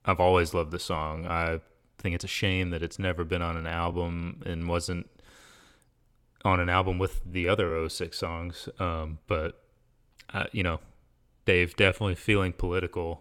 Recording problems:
uneven, jittery; strongly; from 1 to 12 s

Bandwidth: 17 kHz